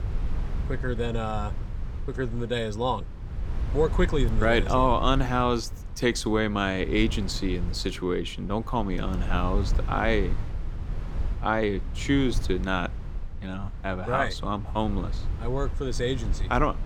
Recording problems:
low rumble; noticeable; throughout; 20 dB below the speech

